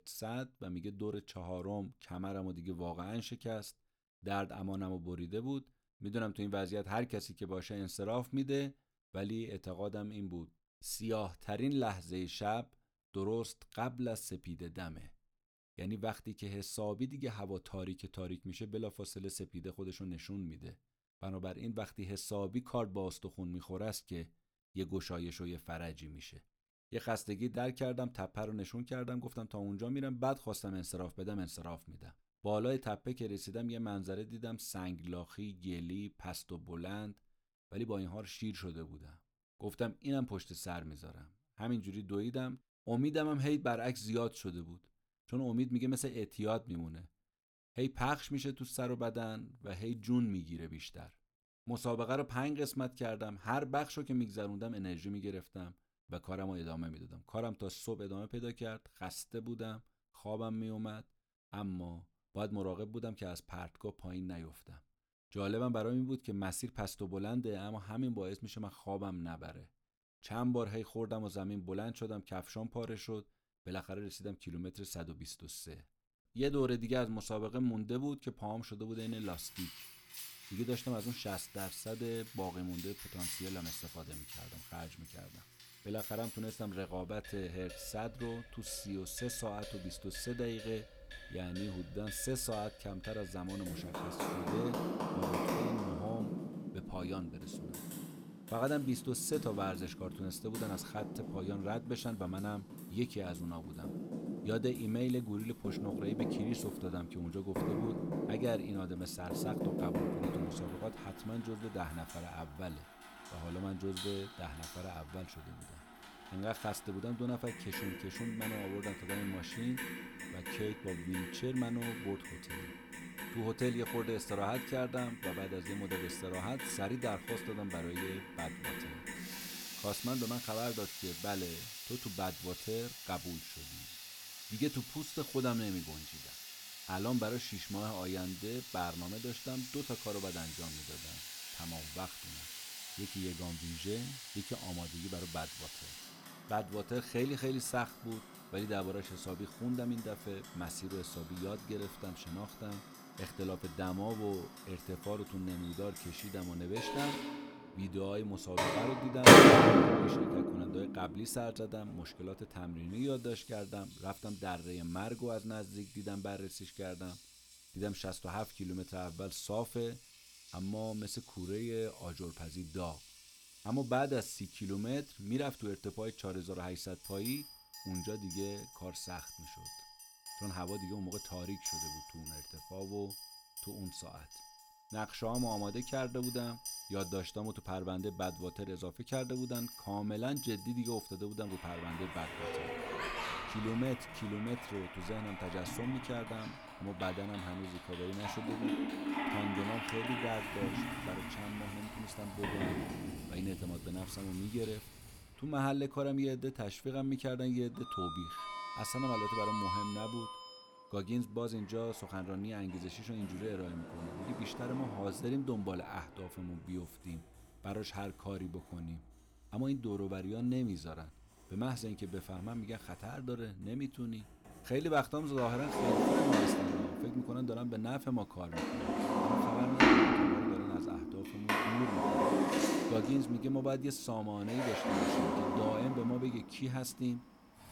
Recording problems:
household noises; very loud; from 1:19 on; 4 dB above the speech

